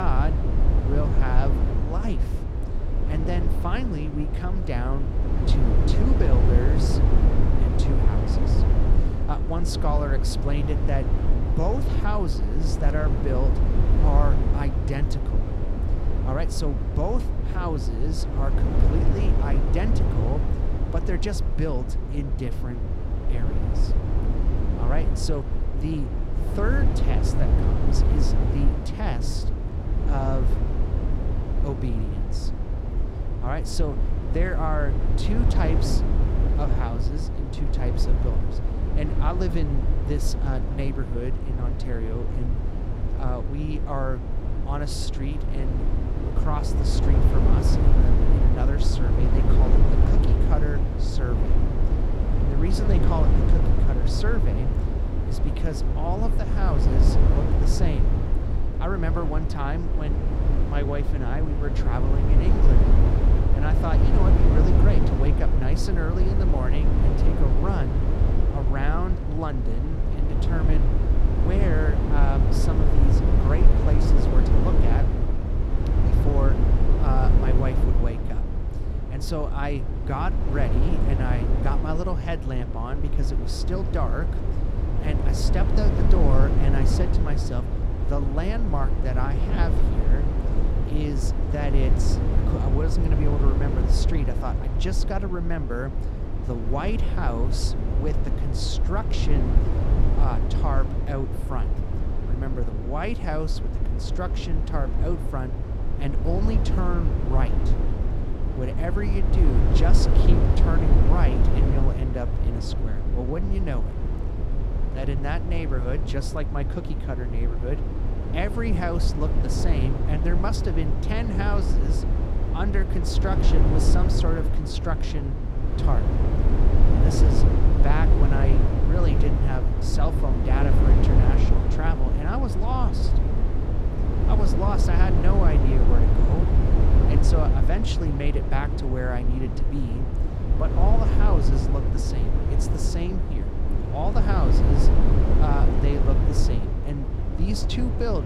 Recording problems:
low rumble; loud; throughout; 1 dB below the speech
abrupt cut into speech; at the start and the end

